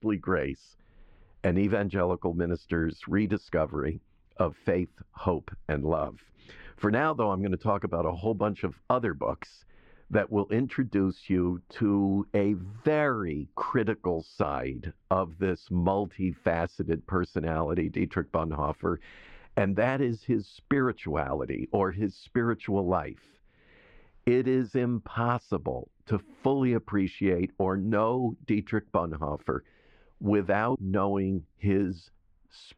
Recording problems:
muffled; very; fading above 2 kHz

